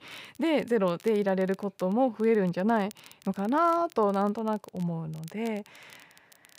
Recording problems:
crackle, like an old record; faint; 25 dB below the speech

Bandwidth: 15.5 kHz